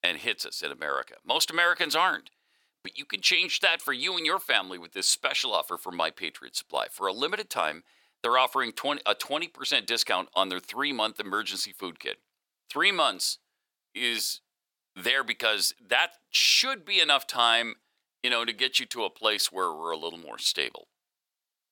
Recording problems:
thin; very; fading below 600 Hz

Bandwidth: 17 kHz